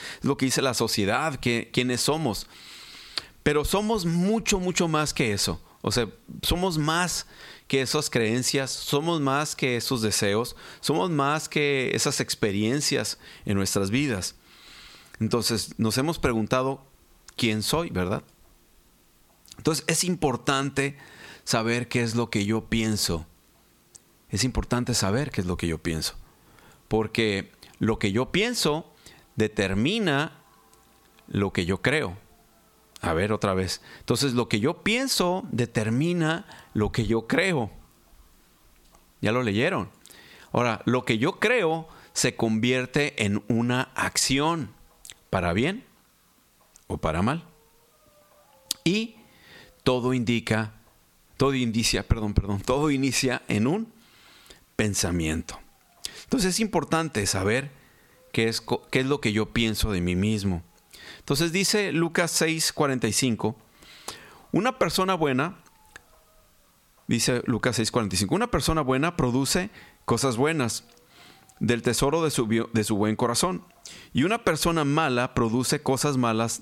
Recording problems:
squashed, flat; somewhat

